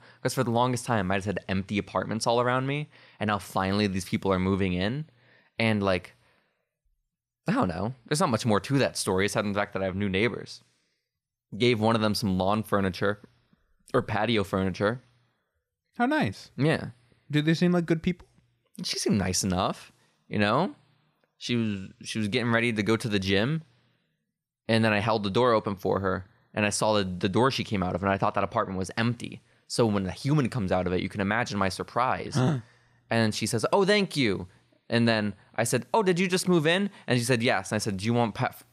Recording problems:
none

